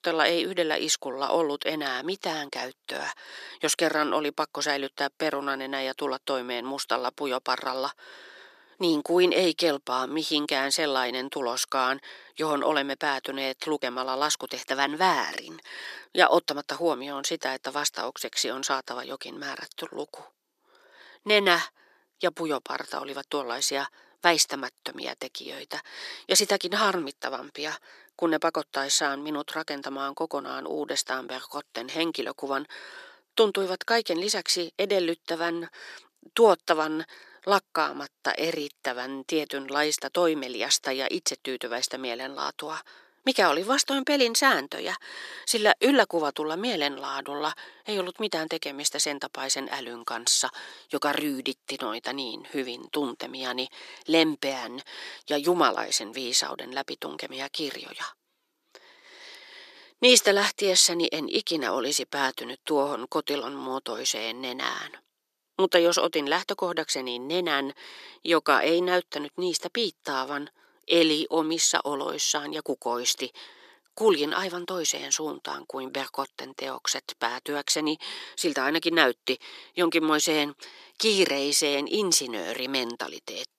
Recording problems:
thin; somewhat; fading below 350 Hz

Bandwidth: 14 kHz